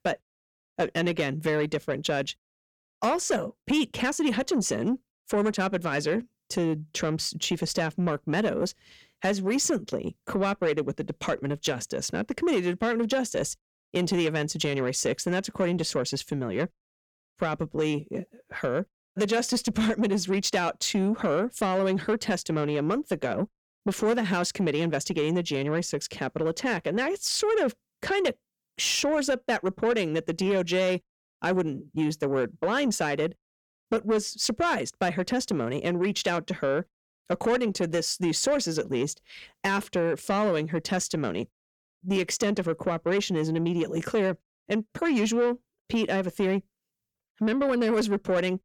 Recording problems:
distortion; slight; 10 dB below the speech

